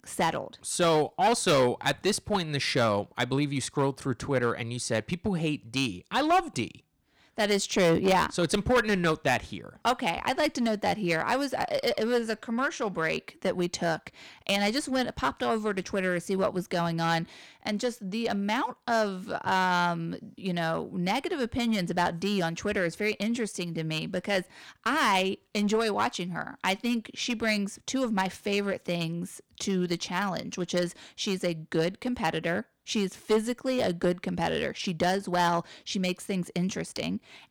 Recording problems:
distortion; slight; 5% of the sound clipped

